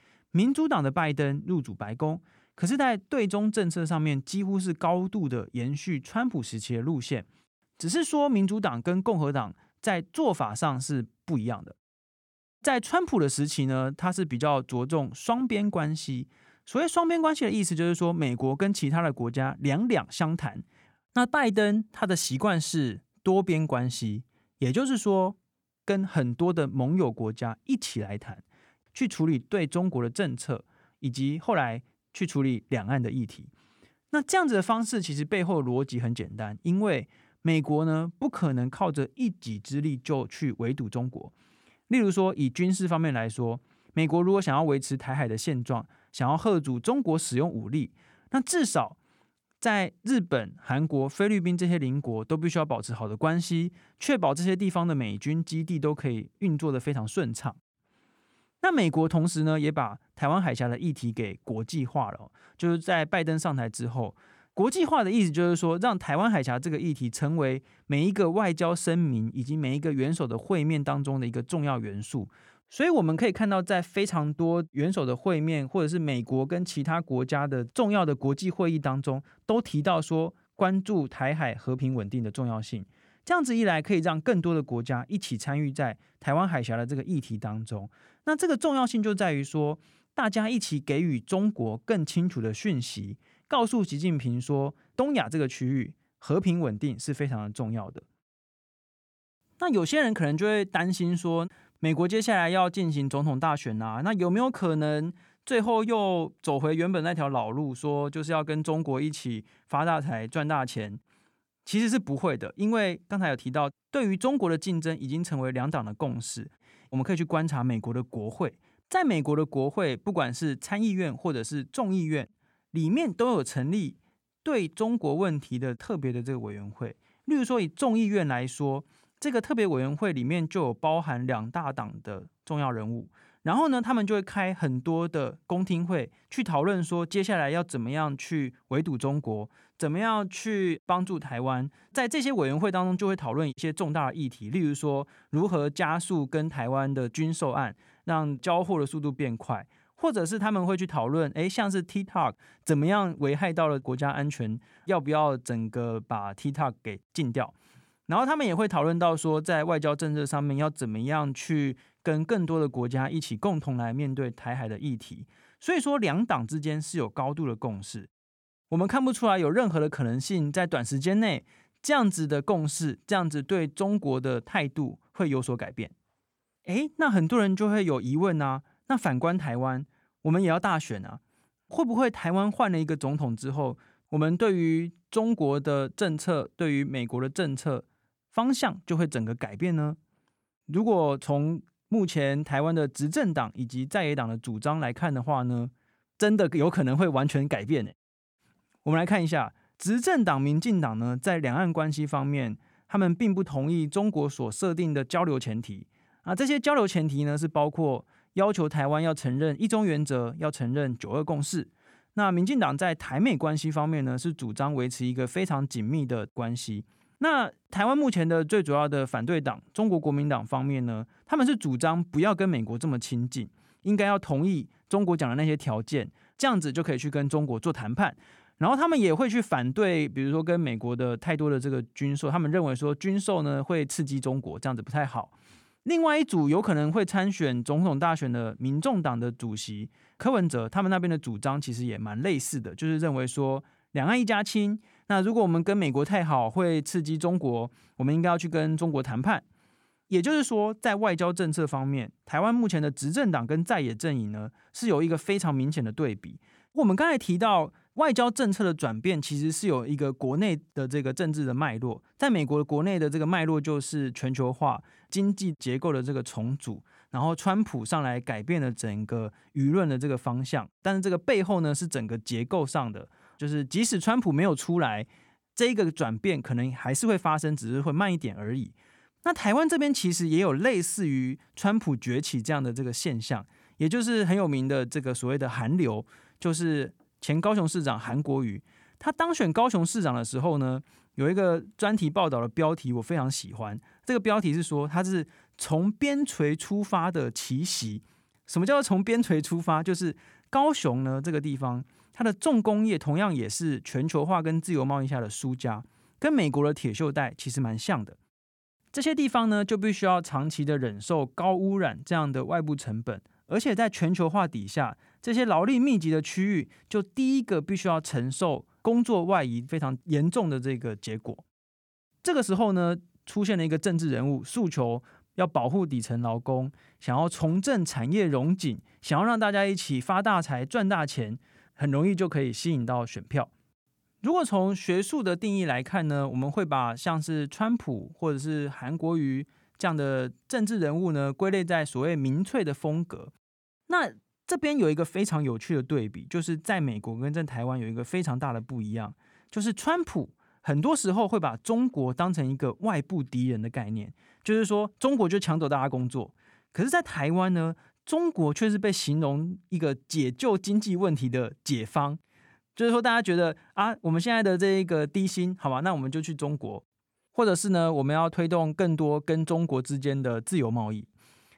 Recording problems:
none

